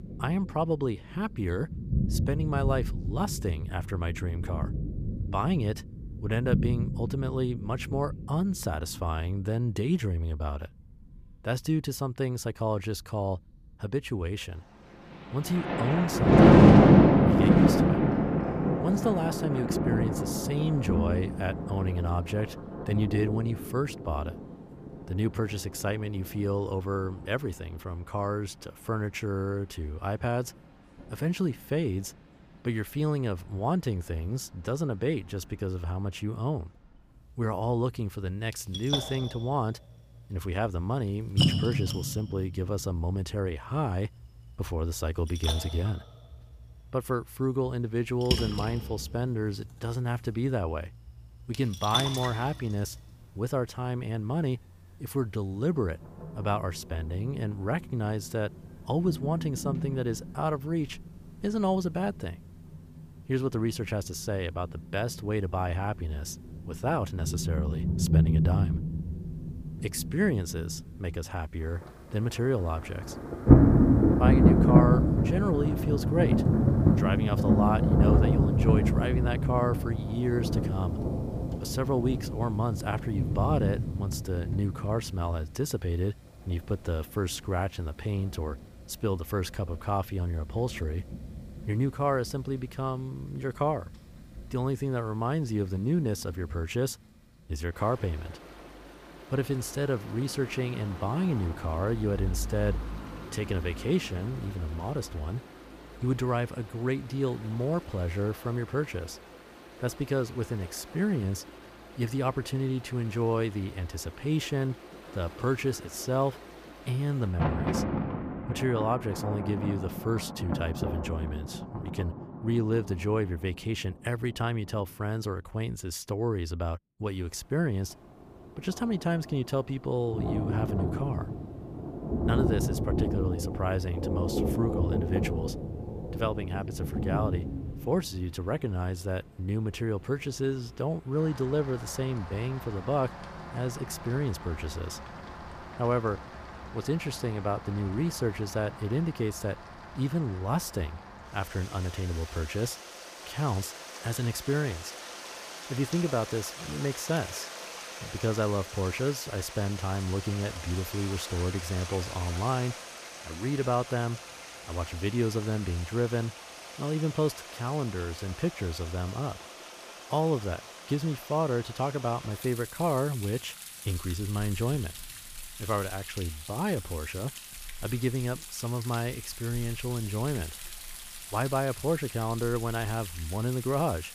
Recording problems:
rain or running water; very loud; throughout; 2 dB above the speech

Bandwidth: 15 kHz